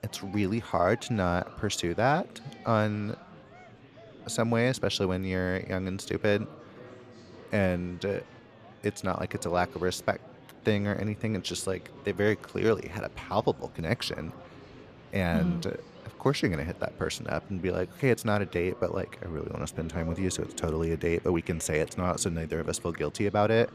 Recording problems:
murmuring crowd; noticeable; throughout; 20 dB below the speech

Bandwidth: 14.5 kHz